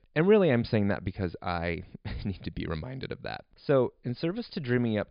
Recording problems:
high frequencies cut off; severe; nothing above 5 kHz

